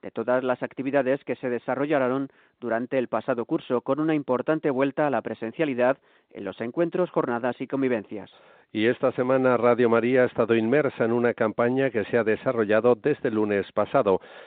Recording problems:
phone-call audio; nothing above 4 kHz

